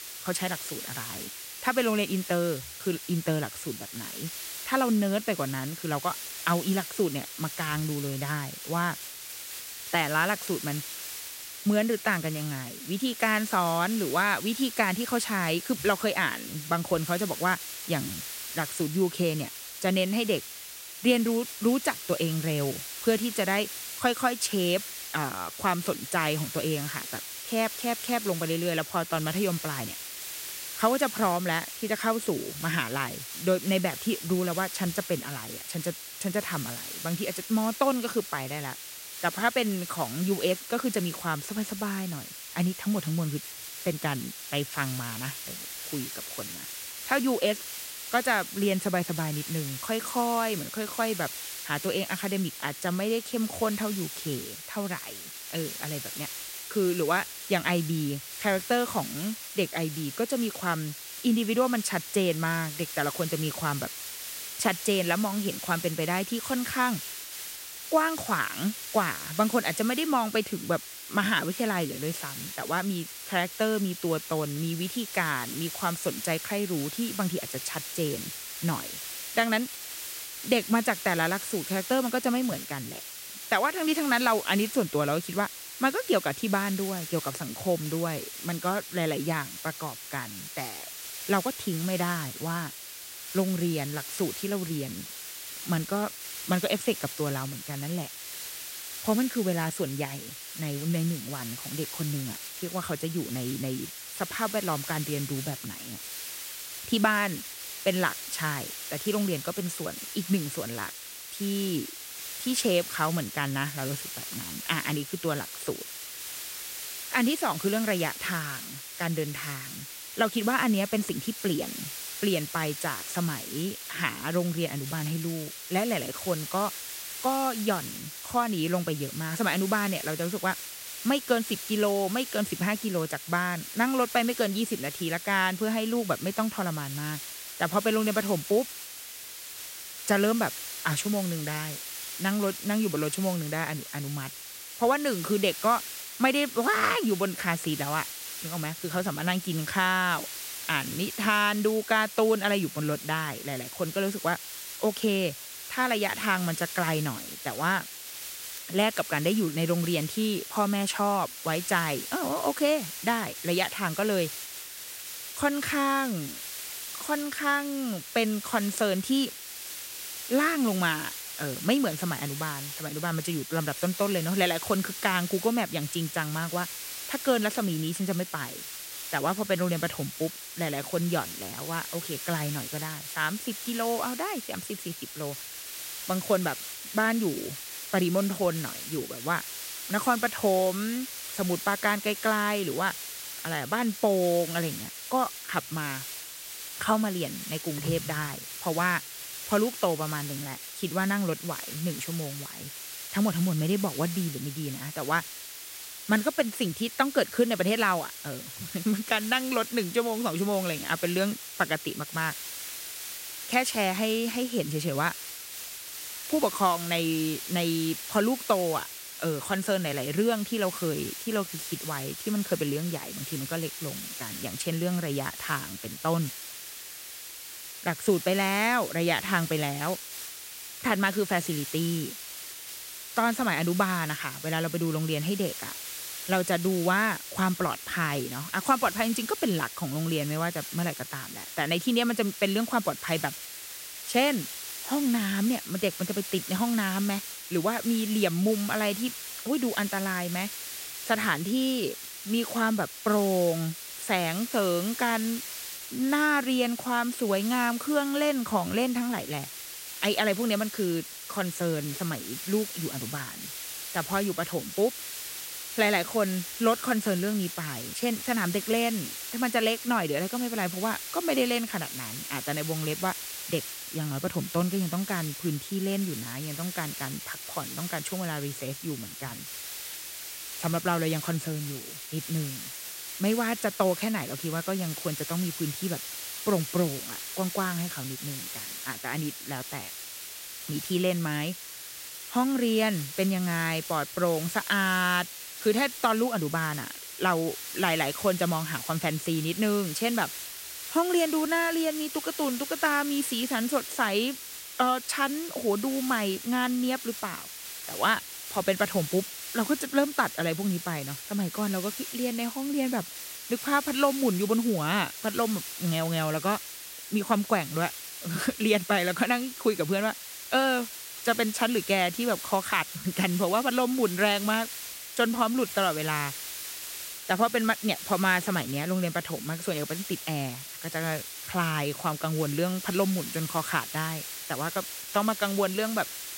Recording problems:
hiss; loud; throughout; 8 dB below the speech

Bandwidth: 16 kHz